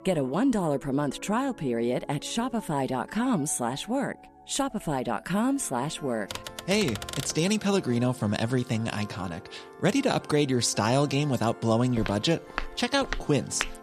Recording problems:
background music; noticeable; throughout; 20 dB below the speech
keyboard typing; noticeable; from 6.5 to 7.5 s; peak 8 dB below the speech
footsteps; noticeable; from 12 s on; peak 7 dB below the speech

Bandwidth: 14 kHz